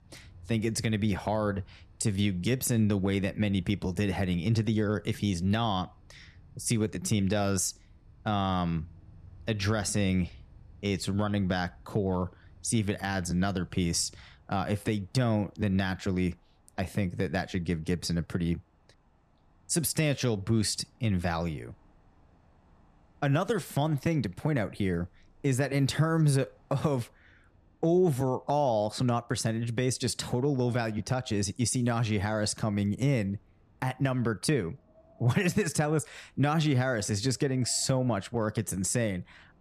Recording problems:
wind in the background; faint; throughout; 30 dB below the speech

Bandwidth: 14 kHz